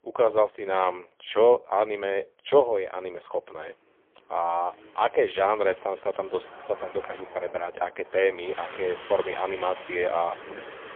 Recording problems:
phone-call audio; poor line; nothing above 3.5 kHz
traffic noise; noticeable; throughout; 15 dB below the speech

